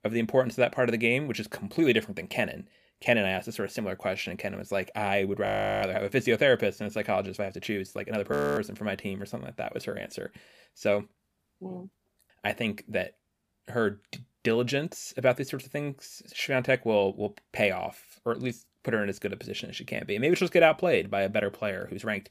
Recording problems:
audio freezing; at 5.5 s and at 8.5 s

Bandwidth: 15 kHz